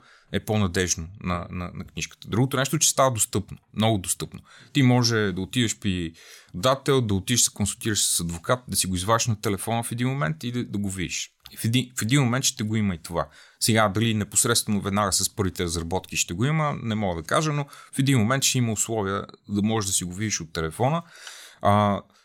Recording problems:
none

